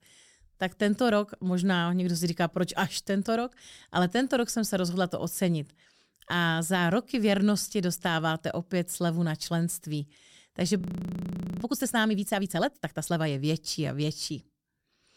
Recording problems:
audio freezing; at 11 s for 1 s

